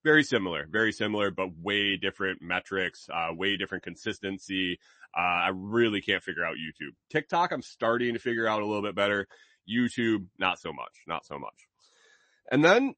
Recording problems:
garbled, watery; slightly; nothing above 8 kHz

